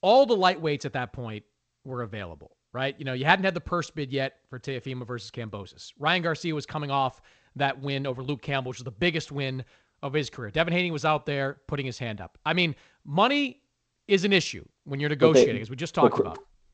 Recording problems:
garbled, watery; slightly; nothing above 7.5 kHz

